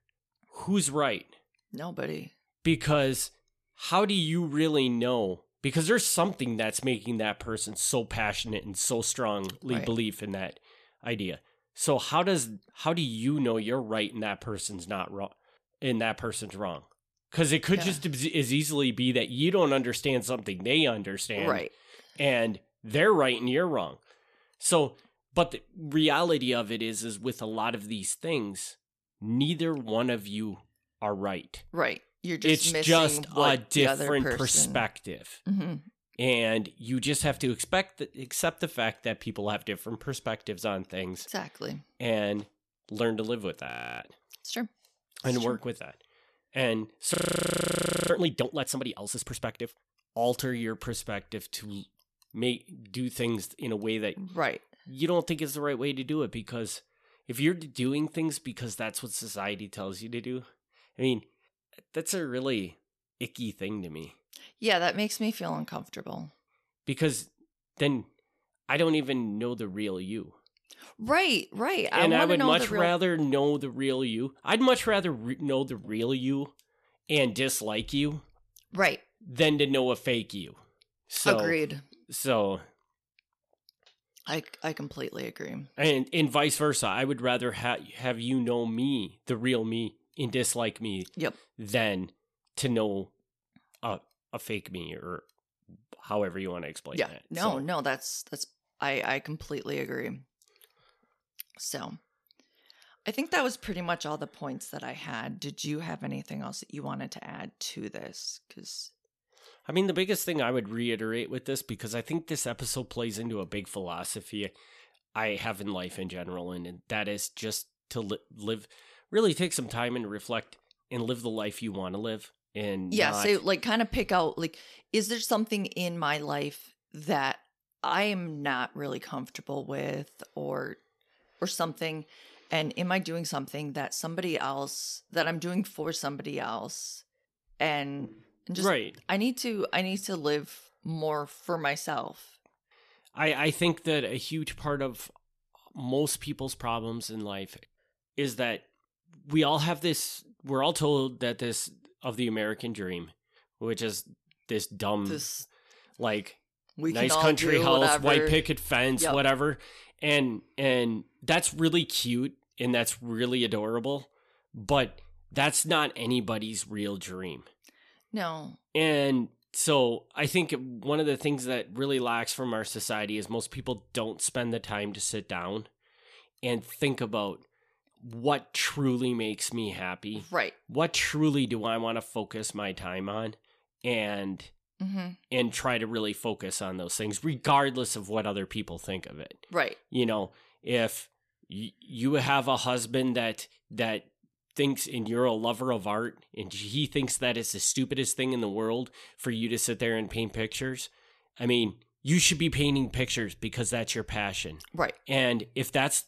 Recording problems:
audio freezing; at 44 s and at 47 s for 1 s

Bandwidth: 14 kHz